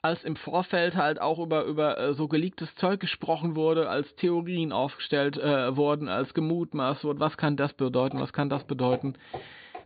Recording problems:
high frequencies cut off; severe; nothing above 4.5 kHz
footsteps; faint; from 8 s on; peak 10 dB below the speech

